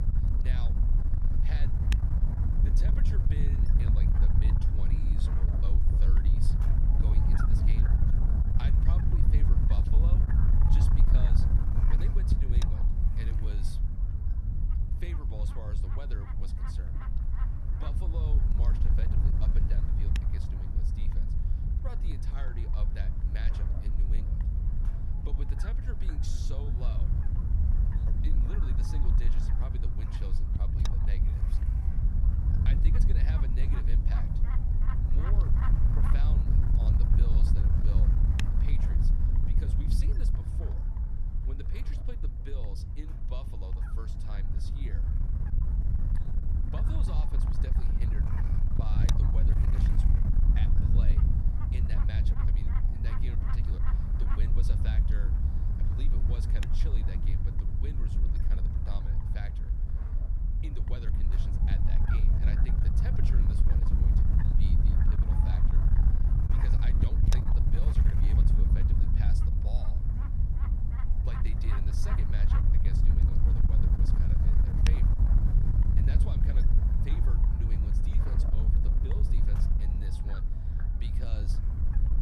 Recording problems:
wind noise on the microphone; heavy; 5 dB above the speech

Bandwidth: 14 kHz